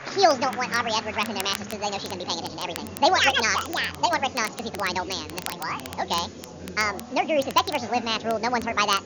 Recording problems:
wrong speed and pitch; too fast and too high; 1.7 times normal speed
high frequencies cut off; noticeable; nothing above 7 kHz
chatter from many people; noticeable; throughout; 15 dB below the speech
crackle, like an old record; noticeable; 15 dB below the speech
hiss; faint; throughout; 25 dB below the speech

